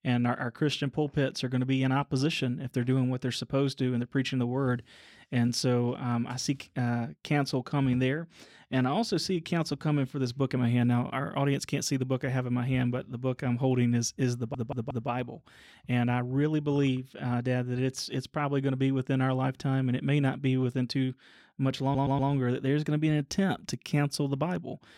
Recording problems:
audio stuttering; at 14 s and at 22 s

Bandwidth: 16 kHz